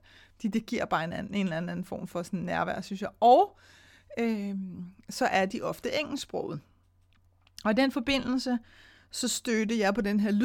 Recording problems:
abrupt cut into speech; at the end

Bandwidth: 17.5 kHz